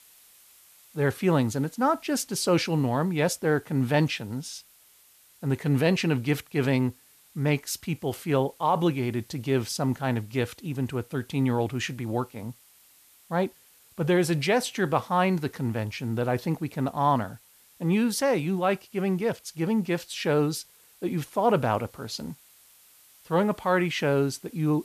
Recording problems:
hiss; faint; throughout; 25 dB below the speech

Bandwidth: 14.5 kHz